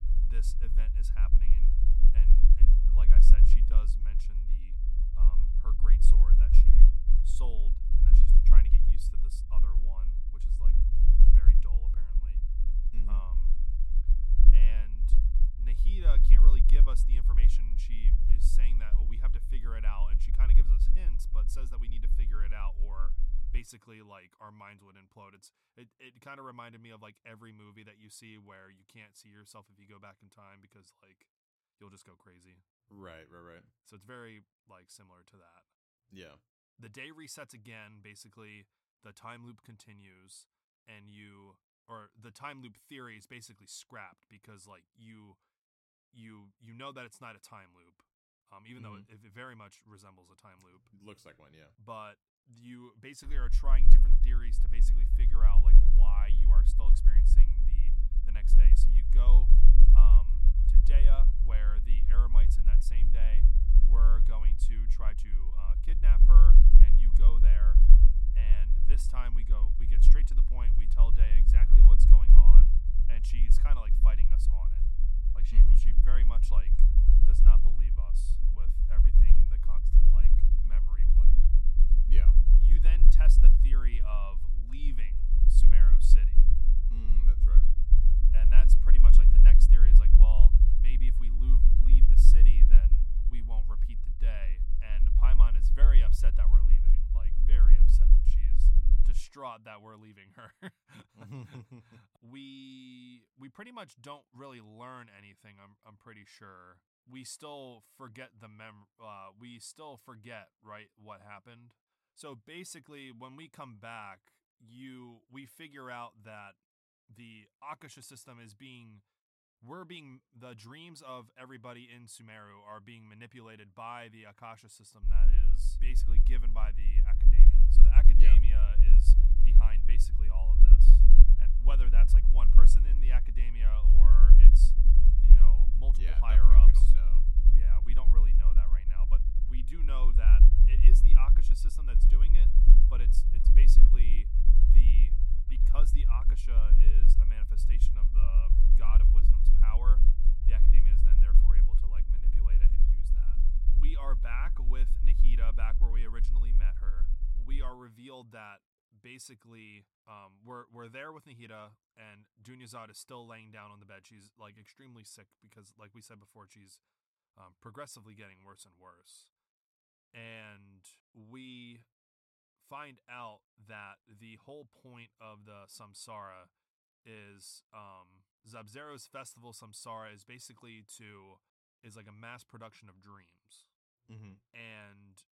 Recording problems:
low rumble; loud; until 24 s, from 53 s to 1:39 and from 2:05 to 2:38; 4 dB below the speech

